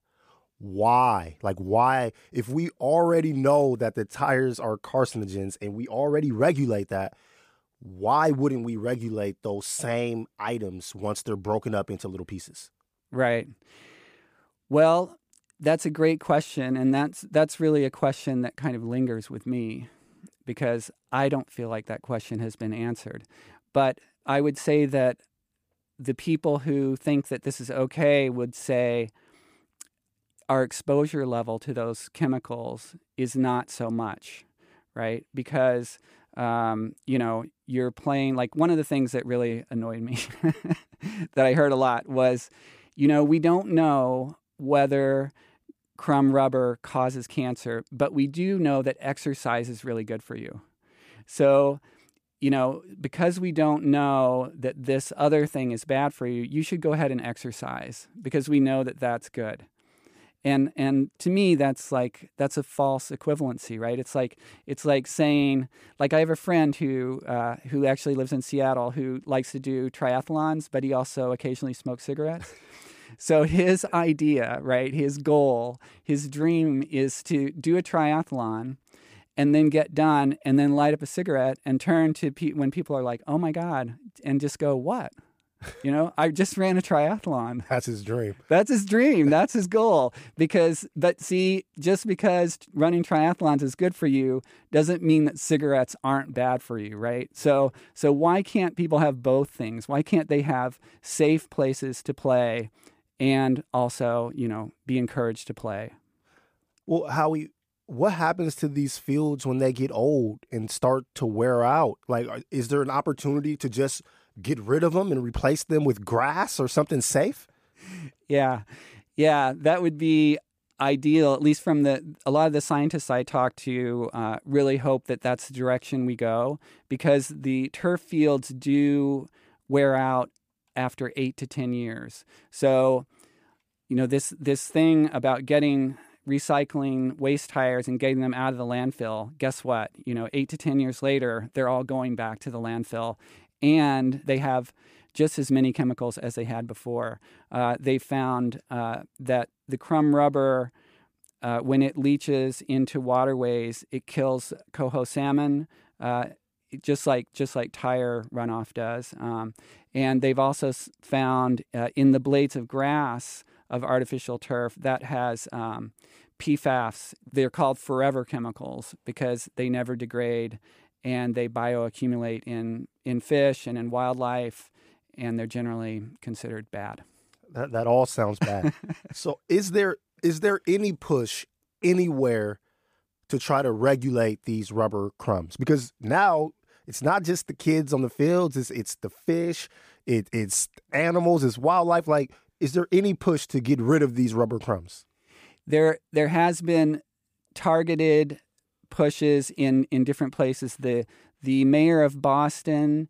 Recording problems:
none

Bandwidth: 15 kHz